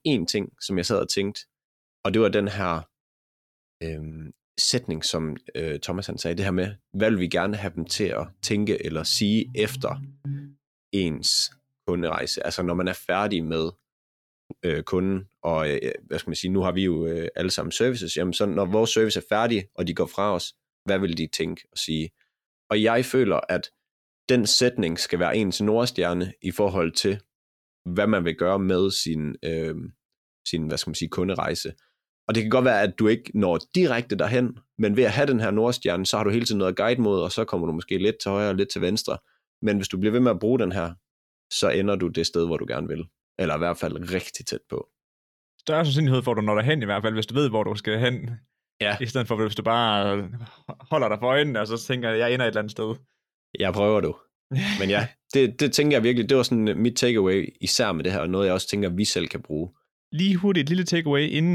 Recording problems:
abrupt cut into speech; at the end

